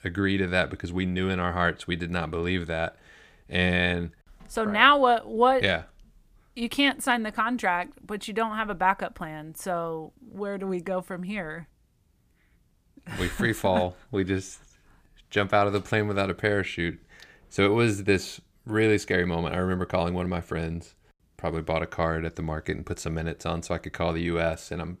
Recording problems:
none

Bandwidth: 15 kHz